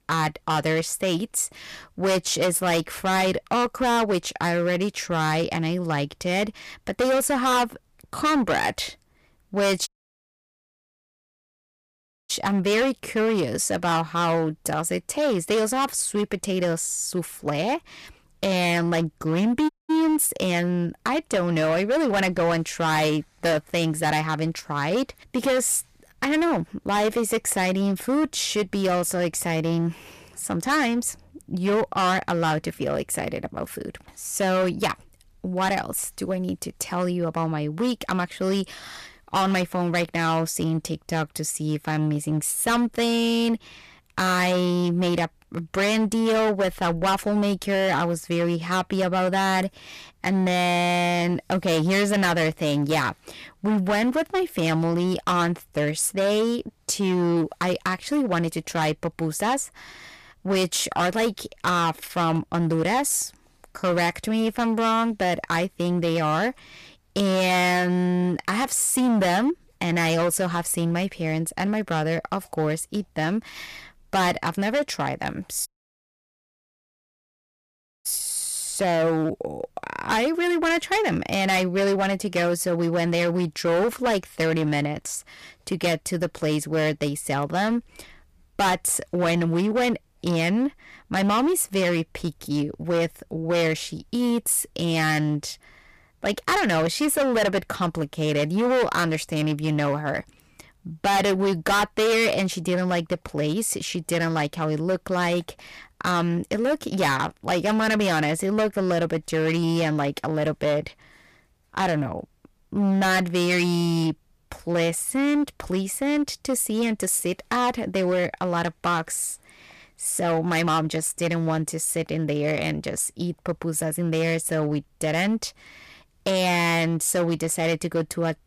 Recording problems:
distortion; heavy; 14% of the sound clipped
audio cutting out; at 10 s for 2.5 s, at 20 s and at 1:16 for 2.5 s

